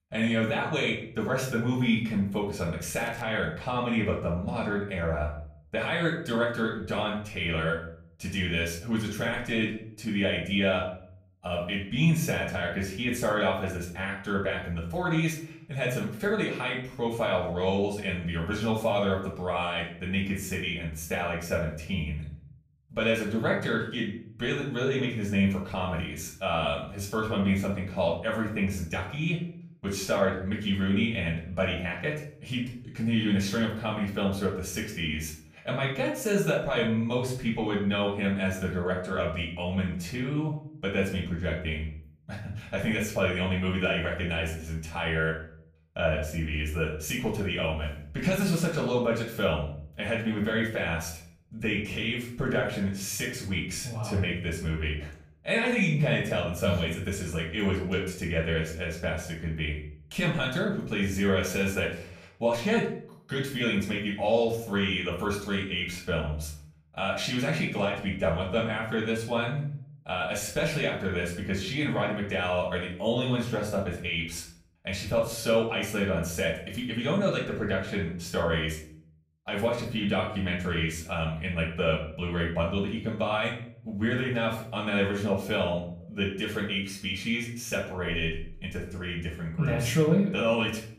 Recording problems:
off-mic speech; far
room echo; slight; dies away in 0.5 s
crackling; faint; at 3 s; 25 dB below the speech

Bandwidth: 15 kHz